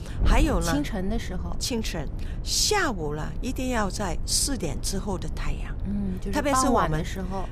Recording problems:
wind noise on the microphone; occasional gusts; 20 dB below the speech

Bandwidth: 14.5 kHz